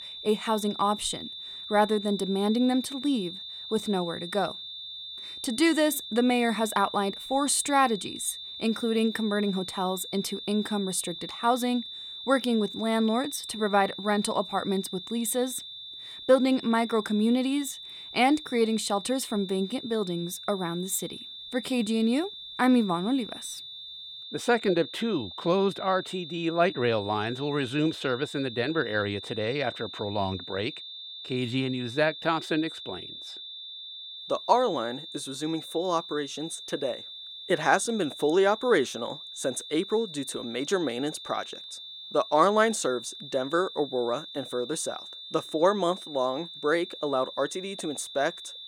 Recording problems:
high-pitched whine; noticeable; throughout; 3.5 kHz, 10 dB below the speech

